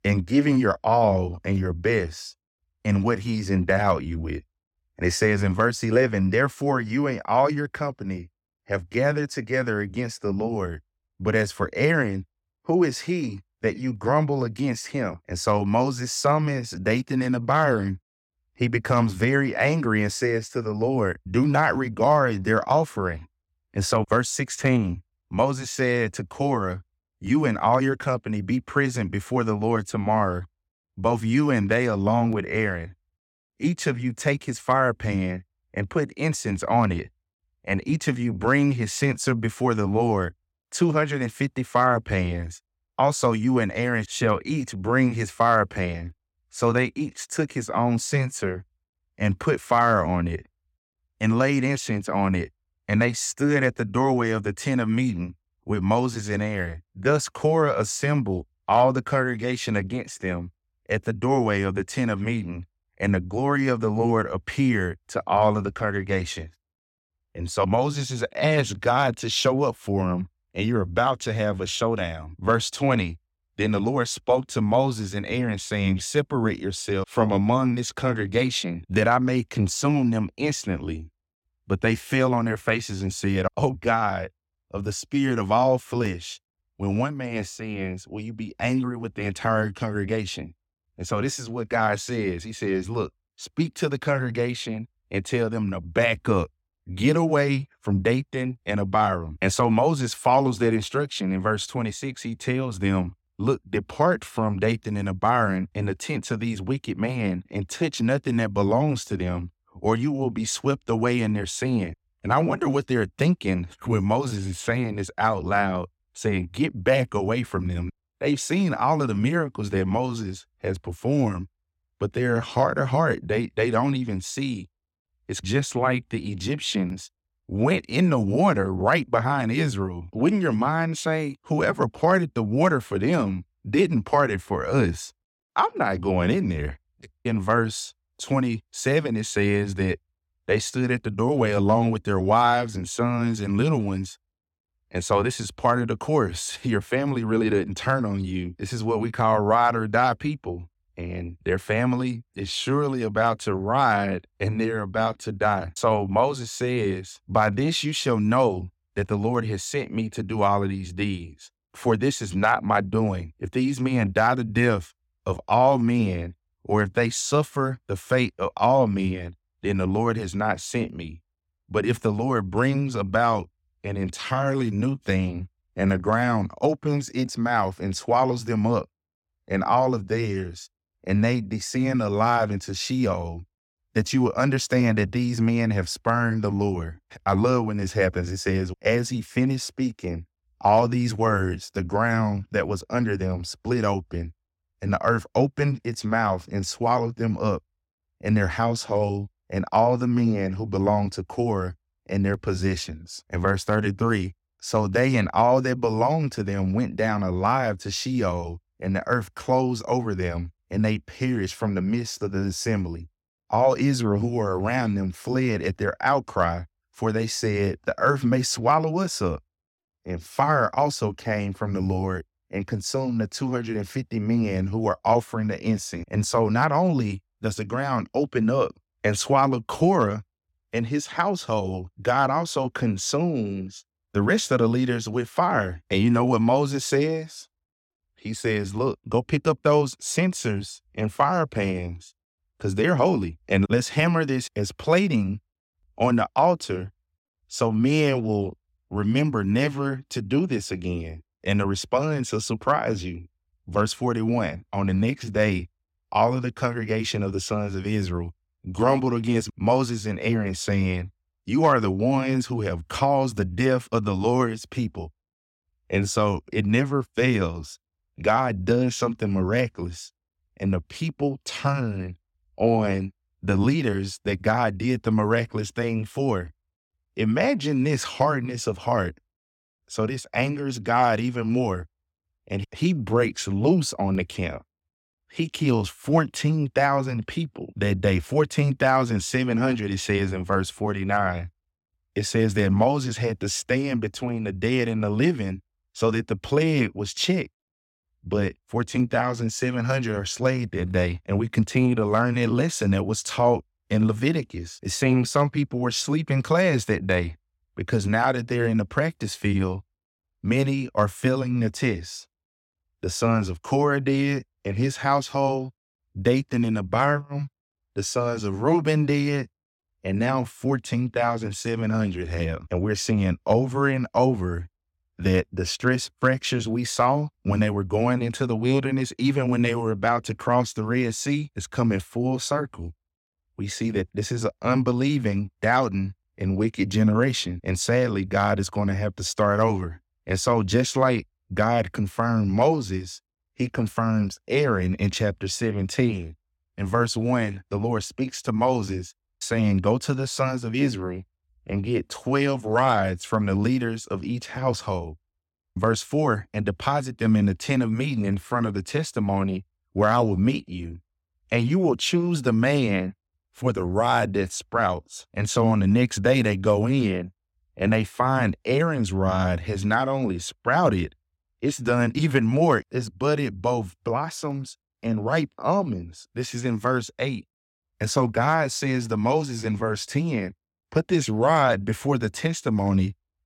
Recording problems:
none

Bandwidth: 16.5 kHz